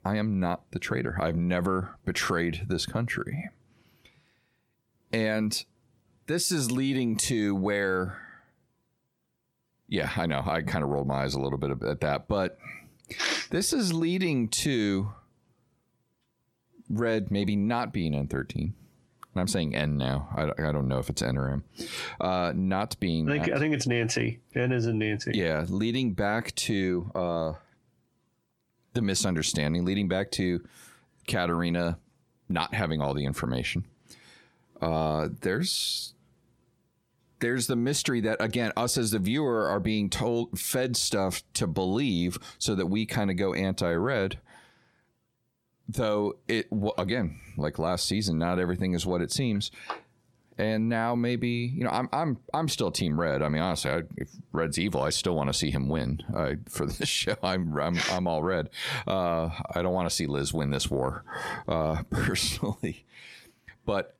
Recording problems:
squashed, flat; heavily

